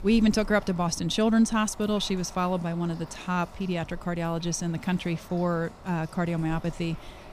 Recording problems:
household noises; noticeable; throughout; 20 dB below the speech

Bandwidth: 15 kHz